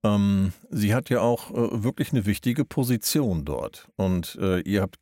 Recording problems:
none

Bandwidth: 16 kHz